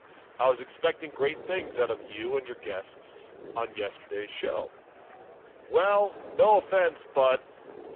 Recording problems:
phone-call audio; poor line
wind noise on the microphone; occasional gusts; 25 dB below the speech
rain or running water; faint; throughout; 25 dB below the speech
murmuring crowd; faint; throughout; 25 dB below the speech

